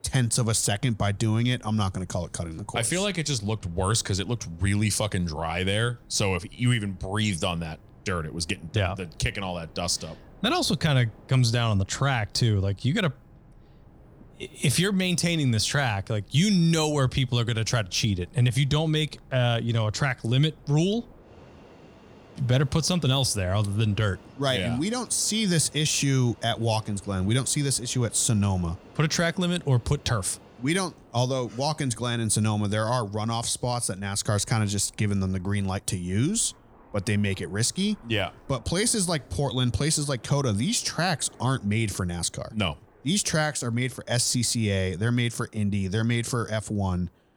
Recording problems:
train or aircraft noise; faint; throughout; 25 dB below the speech

